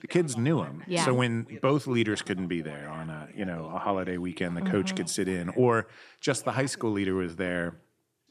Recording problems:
voice in the background; faint; throughout; 20 dB below the speech

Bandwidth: 14 kHz